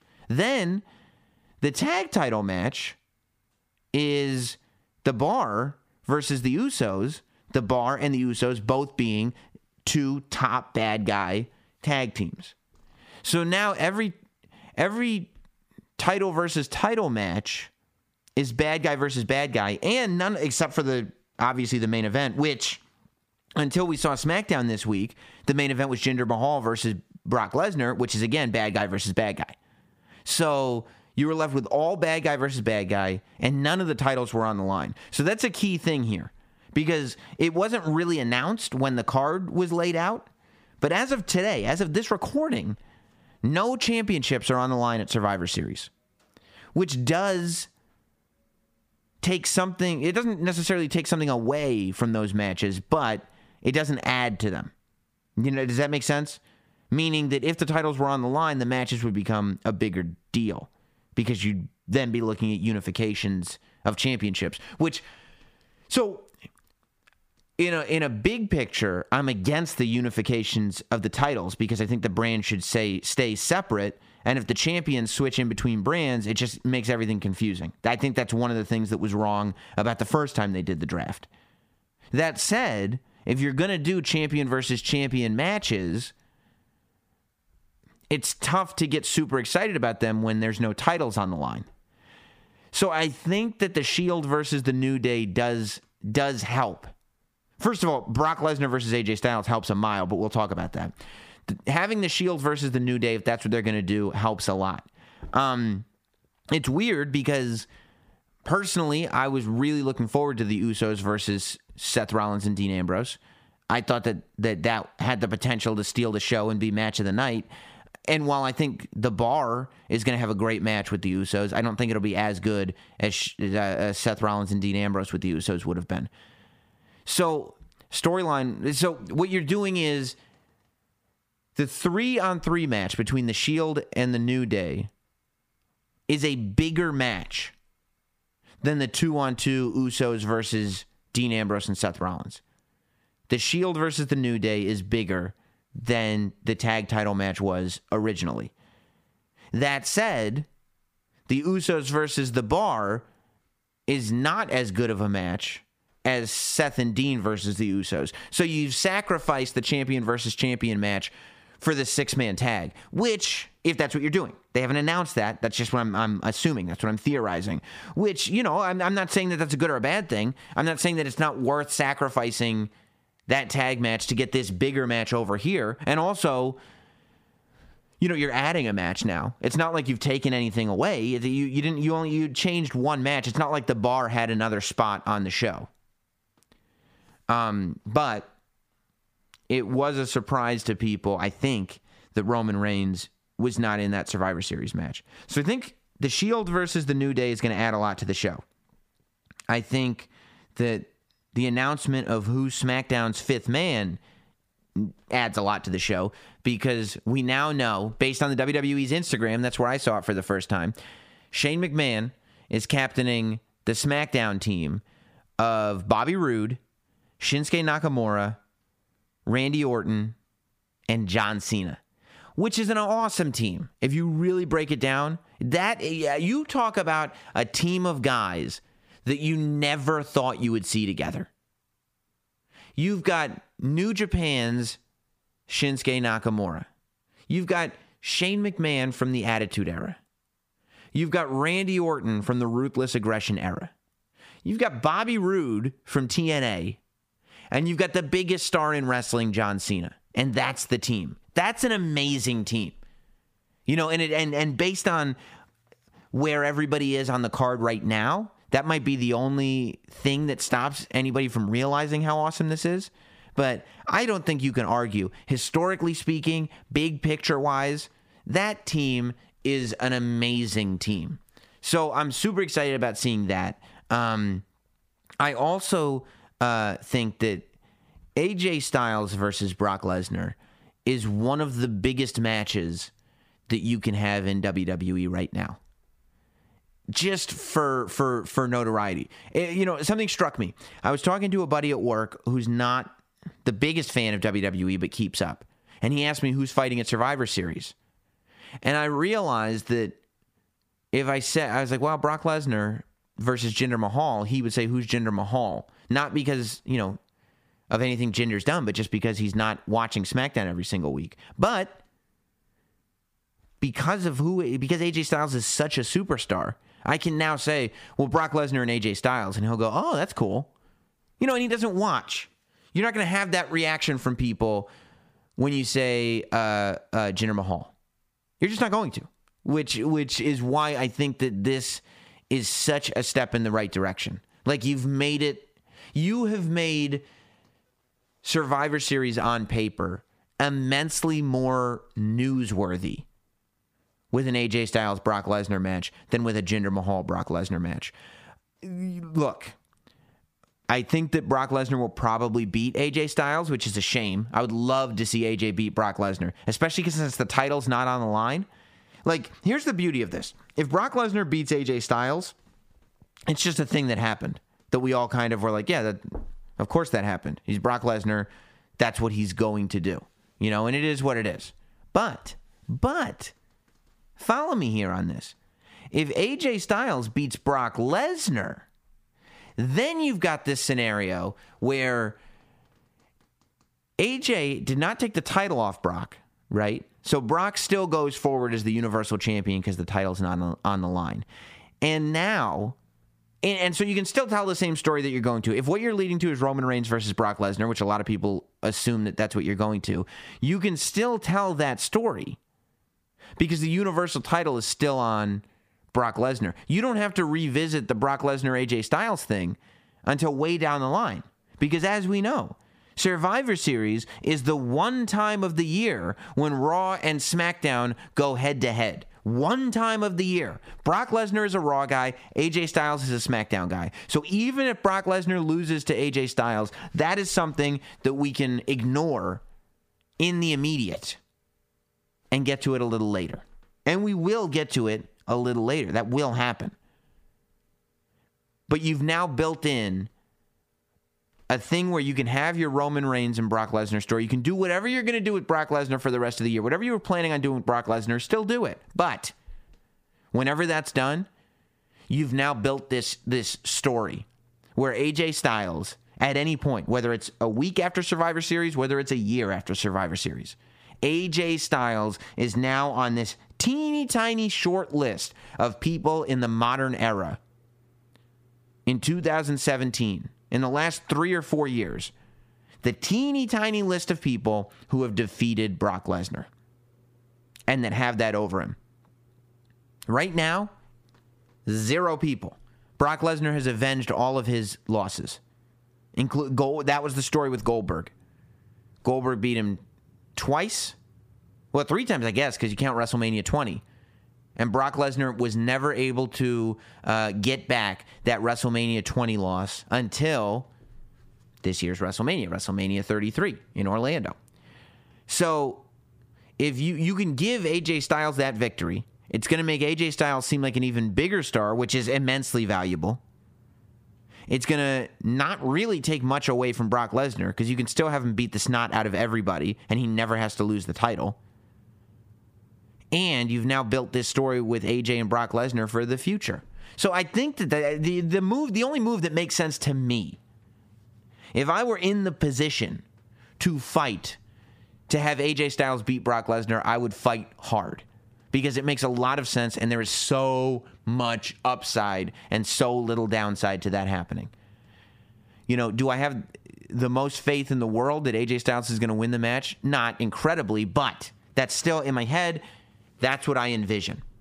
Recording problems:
squashed, flat; somewhat

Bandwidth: 15 kHz